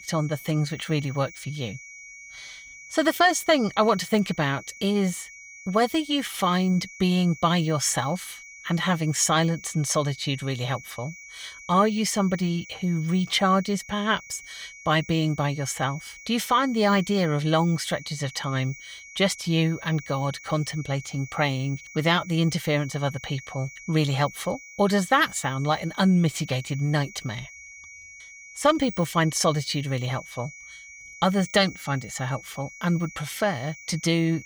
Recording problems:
high-pitched whine; noticeable; throughout; 2.5 kHz, 15 dB below the speech

